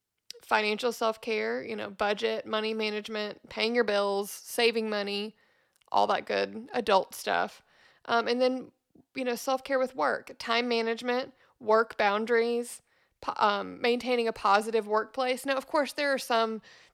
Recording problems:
none

